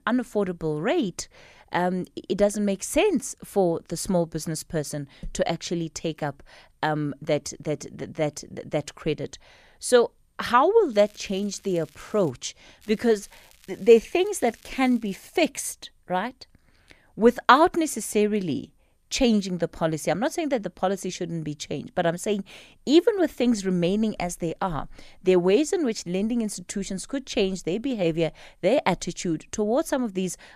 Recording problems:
crackling; faint; from 11 to 12 s and from 13 to 15 s; 30 dB below the speech

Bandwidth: 14.5 kHz